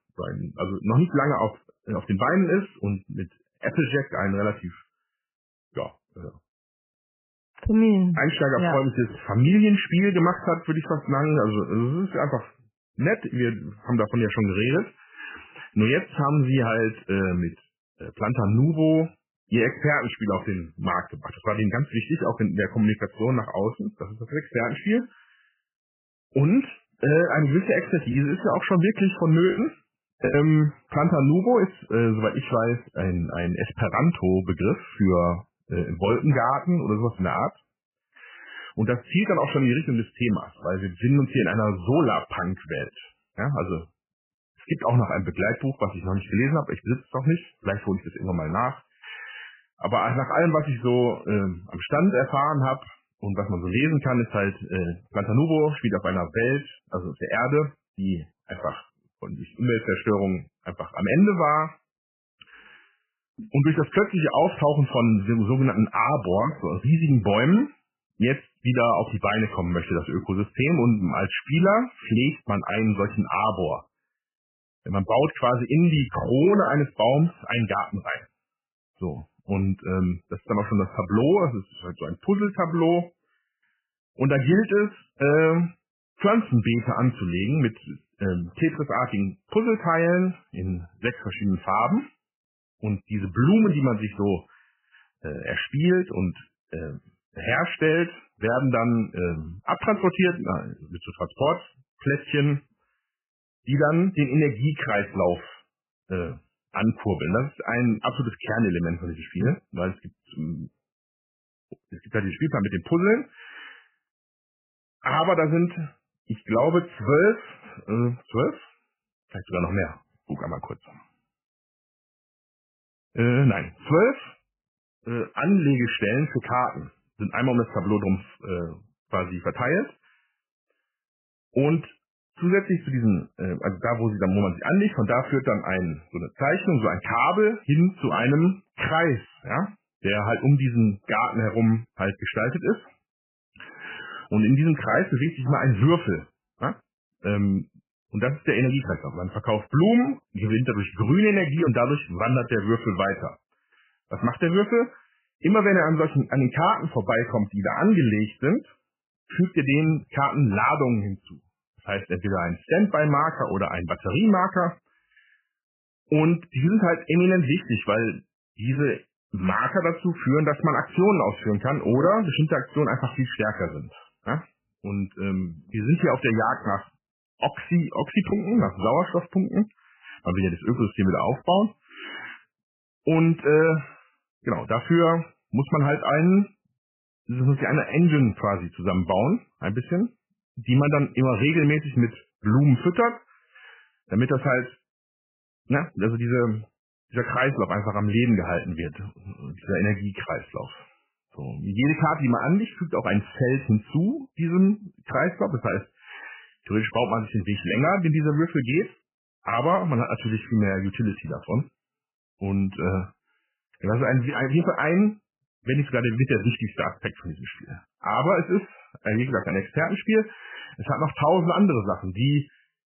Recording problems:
garbled, watery; badly; nothing above 3 kHz
choppy; occasionally; from 28 to 30 s and from 2:56 to 2:58; 4% of the speech affected

